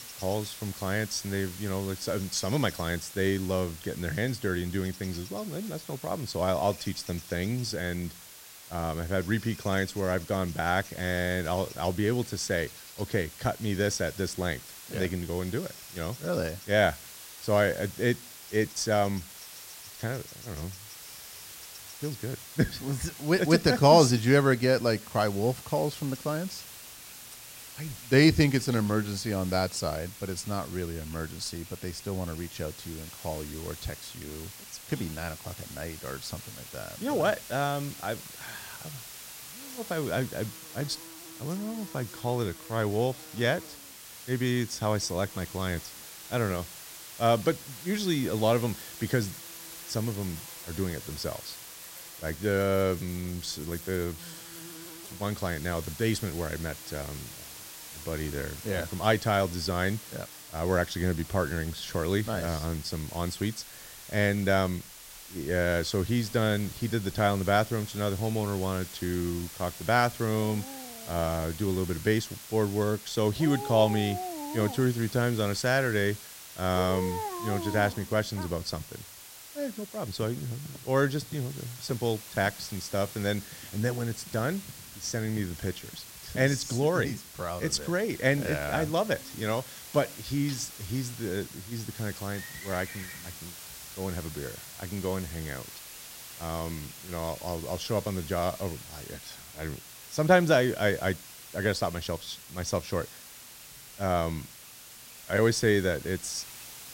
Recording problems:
animal sounds; noticeable; throughout; 20 dB below the speech
hiss; noticeable; throughout; 15 dB below the speech

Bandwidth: 16 kHz